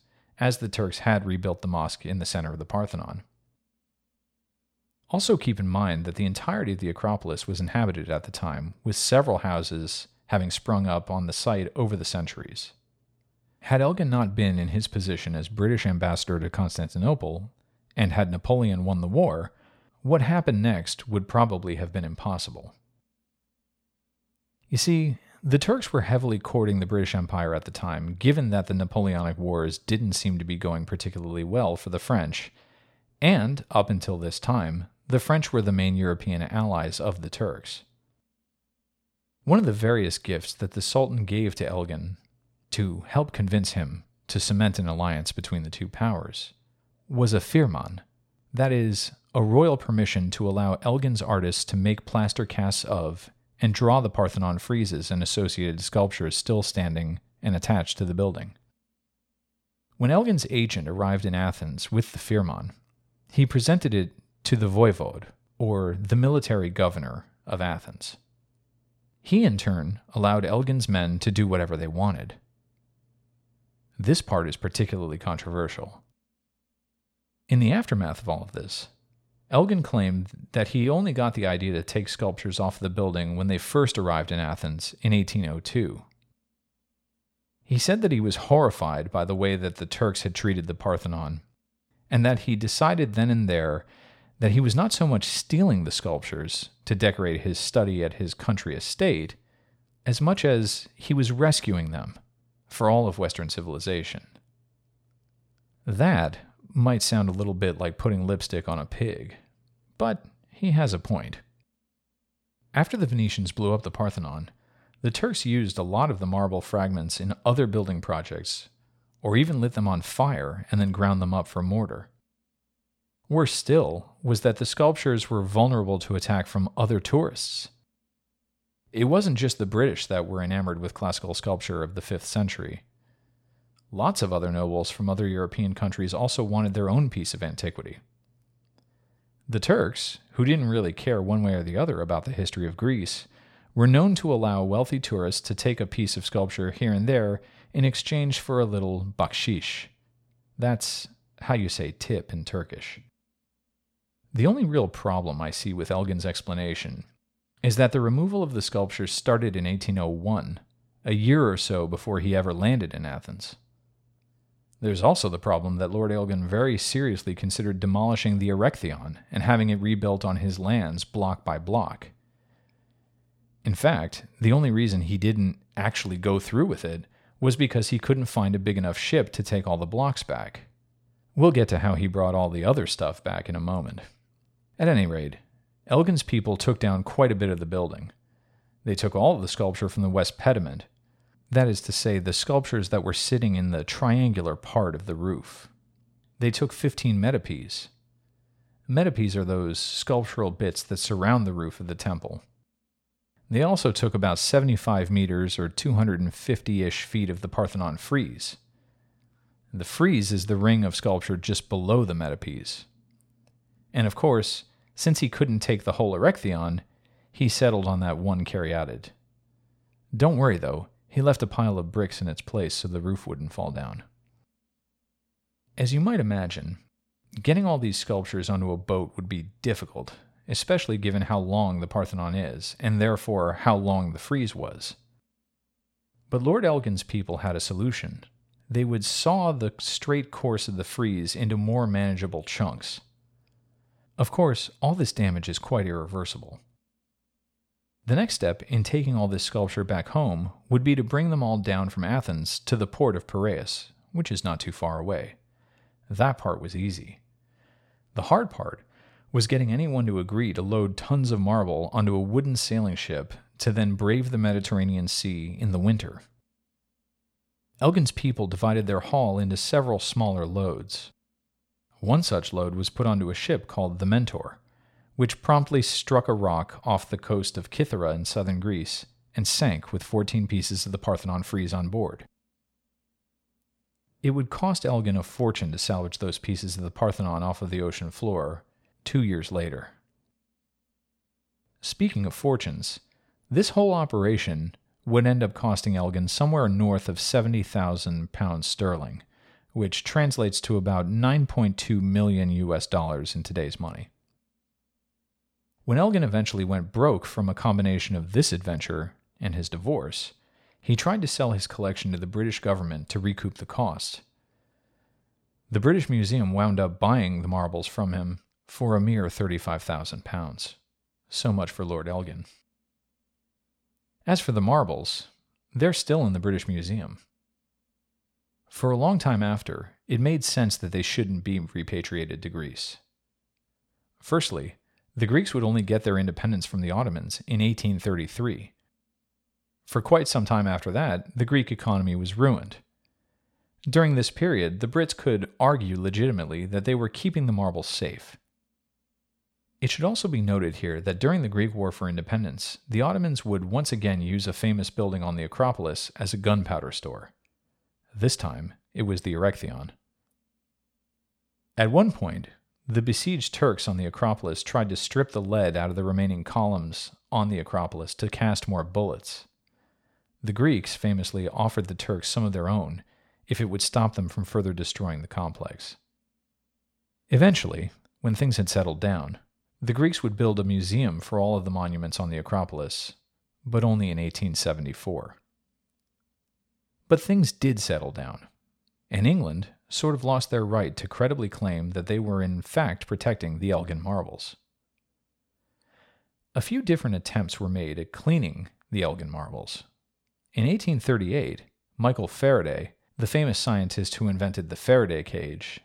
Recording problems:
none

